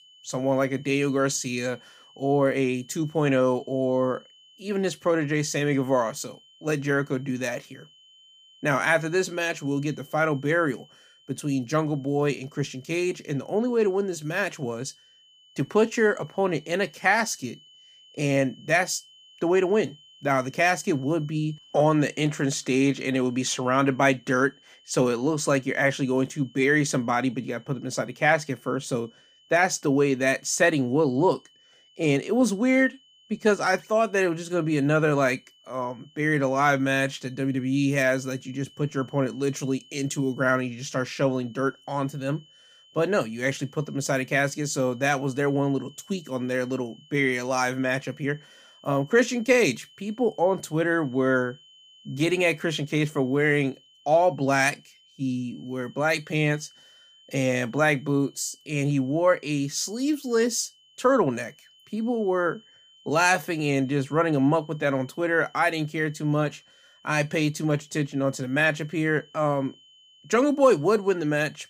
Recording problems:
high-pitched whine; faint; throughout; 3 kHz, 30 dB below the speech

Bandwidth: 15 kHz